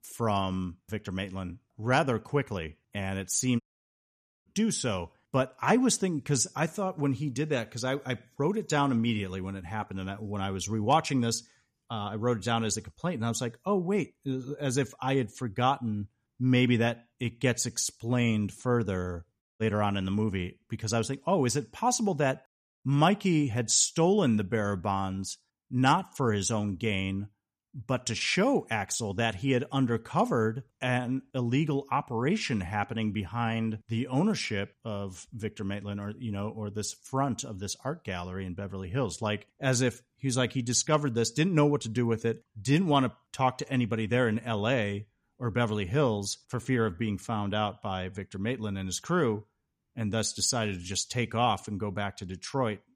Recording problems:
audio cutting out; at 3.5 s for 1 s and at 19 s

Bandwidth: 14.5 kHz